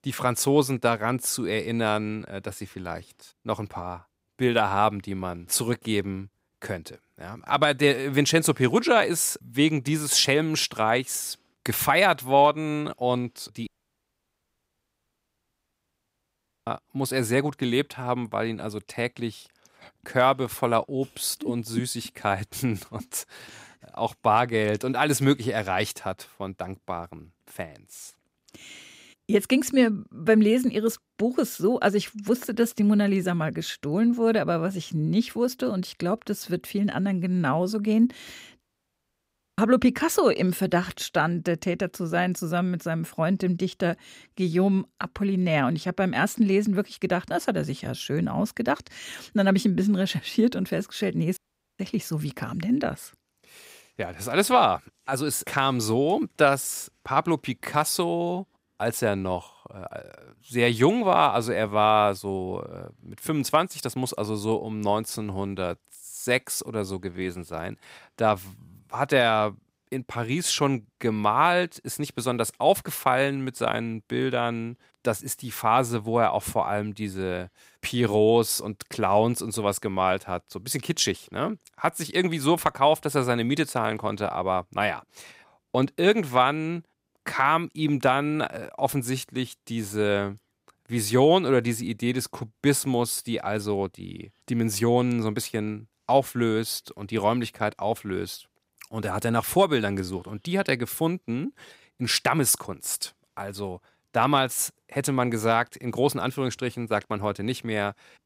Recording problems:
audio cutting out; at 14 s for 3 s, at 39 s for 1 s and at 51 s

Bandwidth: 15.5 kHz